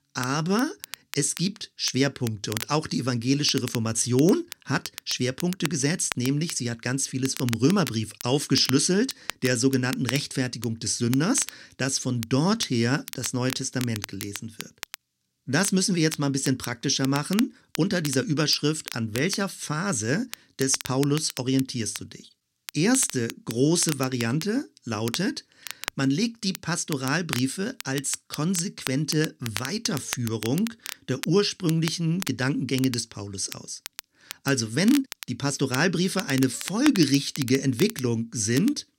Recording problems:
crackle, like an old record; noticeable; 10 dB below the speech

